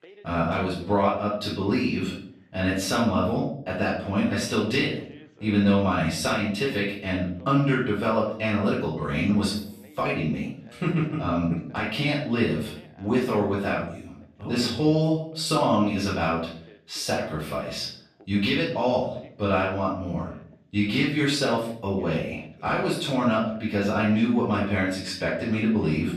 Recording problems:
off-mic speech; far
room echo; noticeable; dies away in 0.5 s
voice in the background; faint; throughout; 25 dB below the speech

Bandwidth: 14.5 kHz